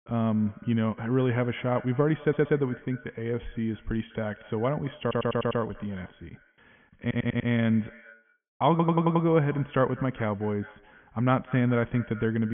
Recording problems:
high frequencies cut off; severe; nothing above 3.5 kHz
echo of what is said; faint; throughout; 200 ms later, 20 dB below the speech
muffled; very slightly; fading above 4 kHz
audio stuttering; 4 times, first at 2 s
abrupt cut into speech; at the end

